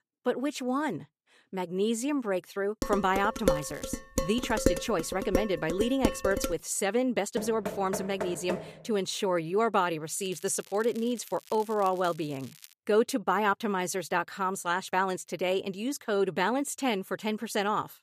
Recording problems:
crackling; faint; at 3.5 s and from 10 to 13 s; 20 dB below the speech
clattering dishes; loud; from 3 to 6.5 s; peak 1 dB above the speech
door banging; noticeable; from 7.5 to 8.5 s; peak 6 dB below the speech

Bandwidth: 14.5 kHz